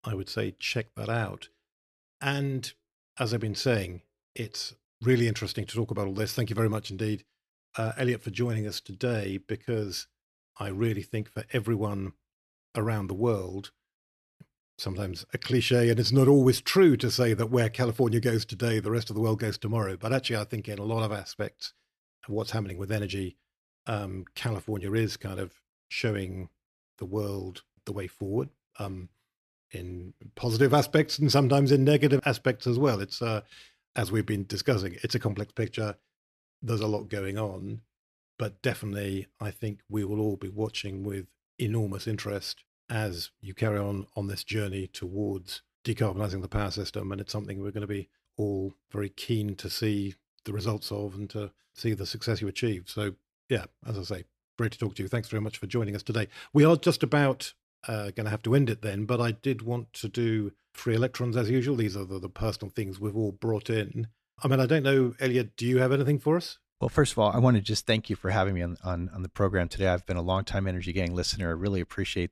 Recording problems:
none

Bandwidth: 14 kHz